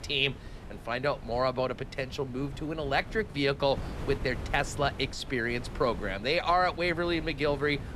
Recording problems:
wind noise on the microphone; occasional gusts; 20 dB below the speech

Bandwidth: 13.5 kHz